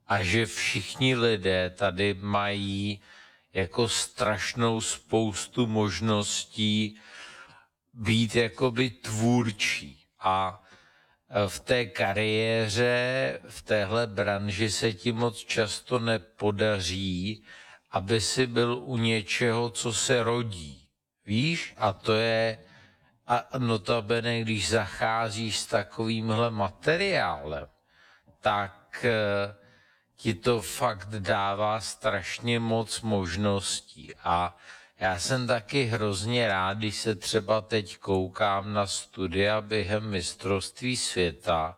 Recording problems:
wrong speed, natural pitch; too slow; 0.6 times normal speed

